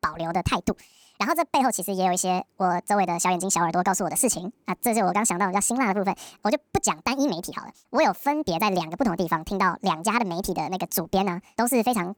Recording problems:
wrong speed and pitch; too fast and too high; 1.6 times normal speed

